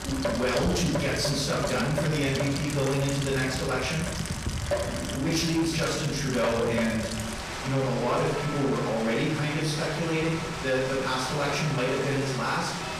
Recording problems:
off-mic speech; far
room echo; noticeable; dies away in 0.7 s
distortion; slight; 10 dB below the speech
rain or running water; loud; throughout; 5 dB below the speech

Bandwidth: 14.5 kHz